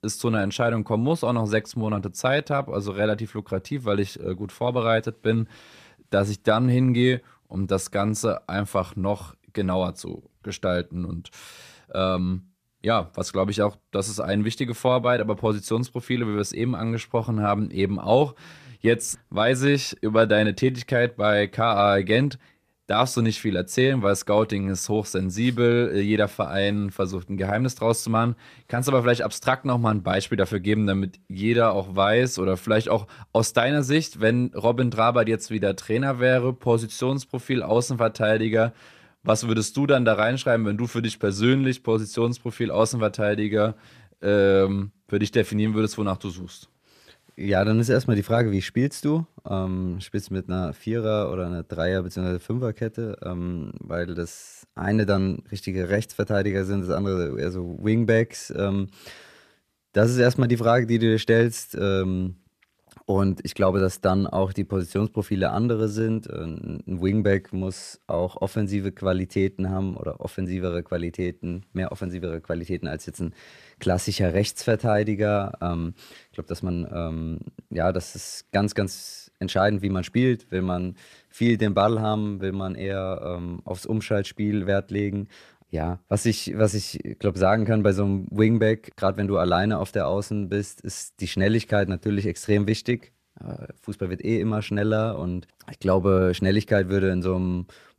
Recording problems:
none

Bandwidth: 14.5 kHz